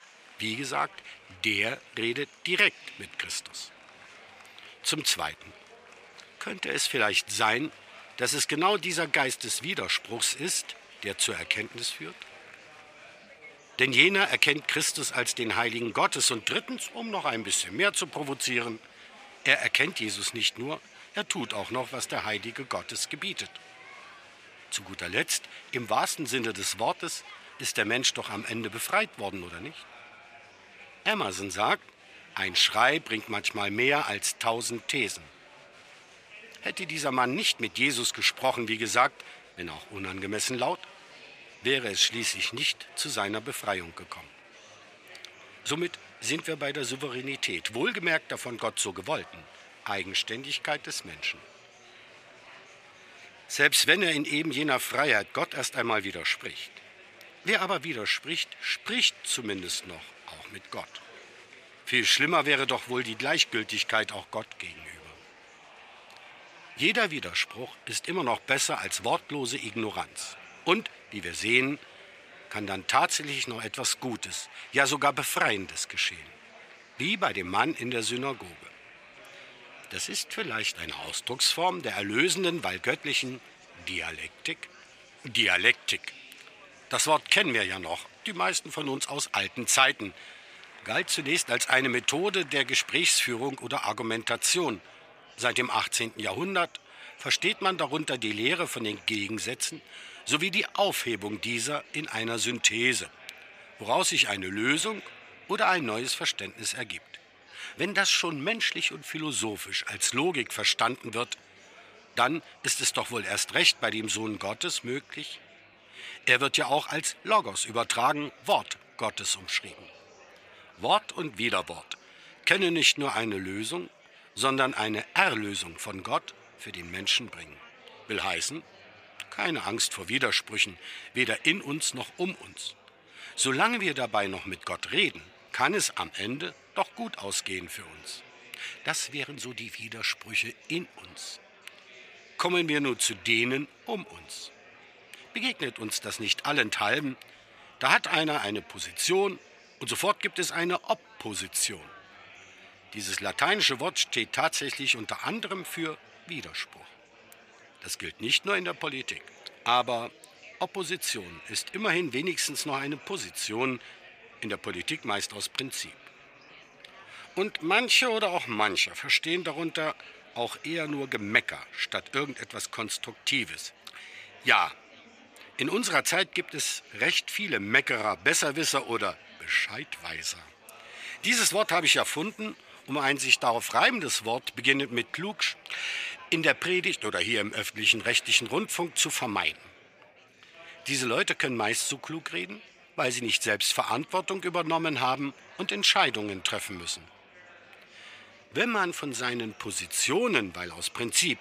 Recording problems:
thin; somewhat; fading below 1 kHz
murmuring crowd; faint; throughout; 25 dB below the speech

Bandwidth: 15 kHz